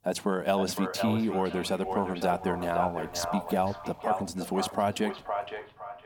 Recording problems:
echo of what is said; strong; throughout; 510 ms later, 6 dB below the speech
traffic noise; faint; from 2 s on; 30 dB below the speech

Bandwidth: 18.5 kHz